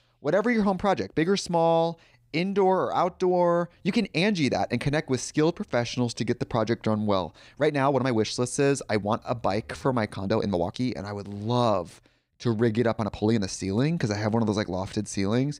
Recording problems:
uneven, jittery; strongly; from 1 to 13 s

